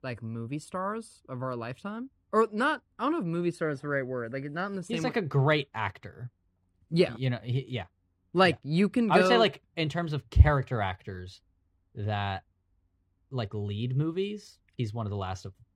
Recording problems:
muffled; slightly; fading above 2.5 kHz

